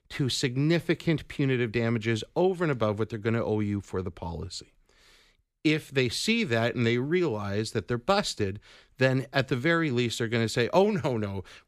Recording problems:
none

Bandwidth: 15 kHz